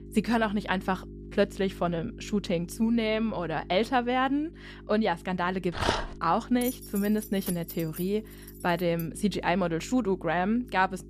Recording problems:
electrical hum; faint; throughout; 50 Hz, 25 dB below the speech
dog barking; noticeable; at 6 s; peak level with the speech
jangling keys; noticeable; from 6.5 to 9 s; peak 10 dB below the speech

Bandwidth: 14.5 kHz